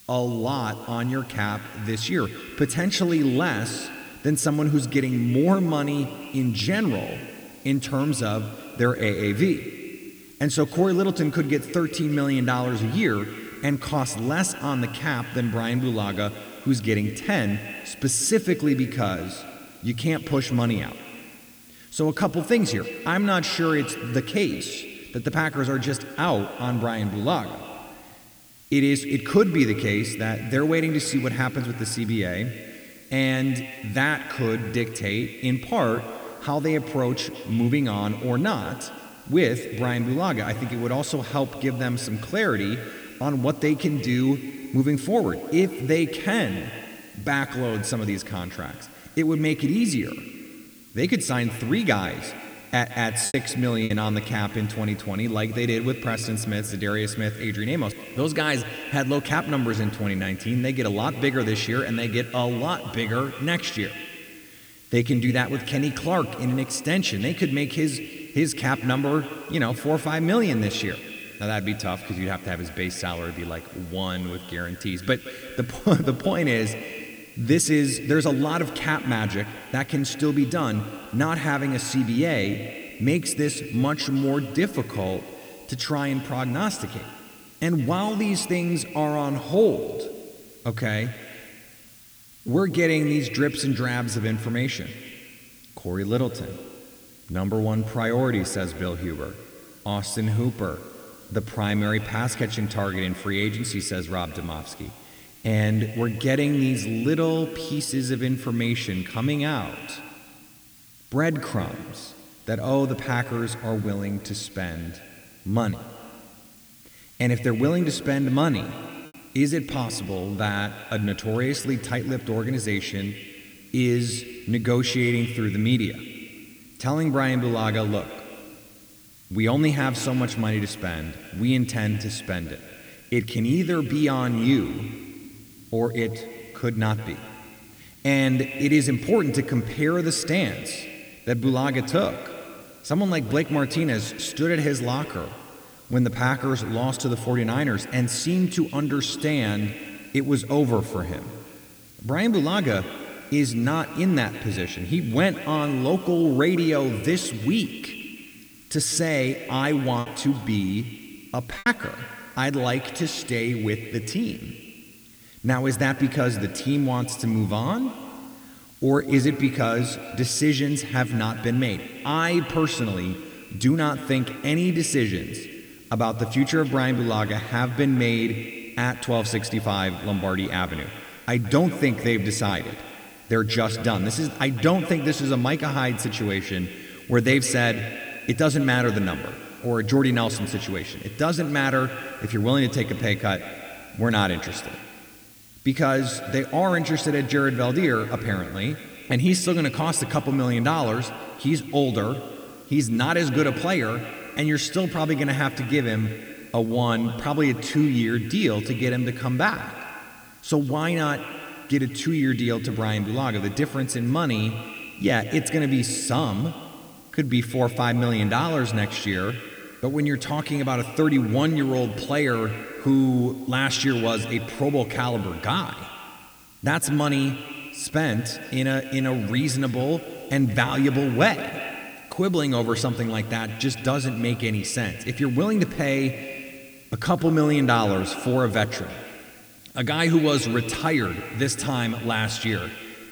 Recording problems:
echo of what is said; noticeable; throughout; 170 ms later, 15 dB below the speech
hiss; faint; throughout; 25 dB below the speech
choppy; occasionally; at 53 s and from 2:40 to 2:42; 3% of the speech affected

